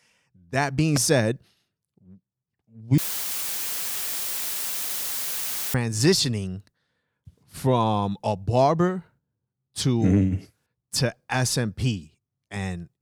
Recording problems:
audio cutting out; filled with static; at 3 s for 3 s

